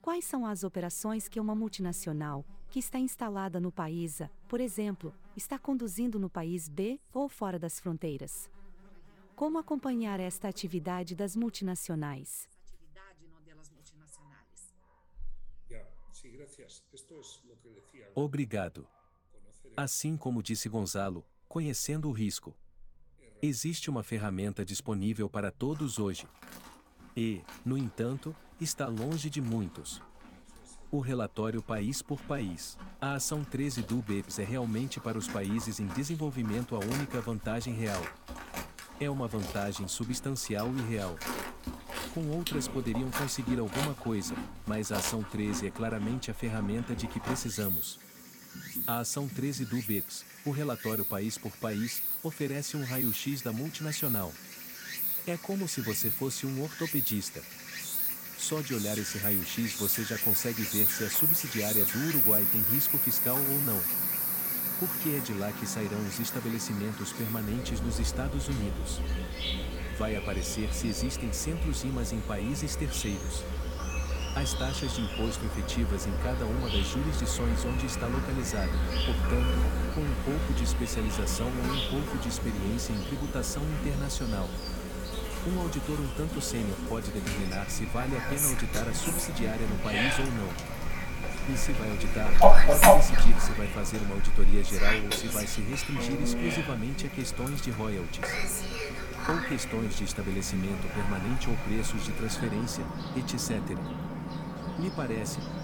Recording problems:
animal sounds; very loud; throughout; 4 dB above the speech

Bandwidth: 17.5 kHz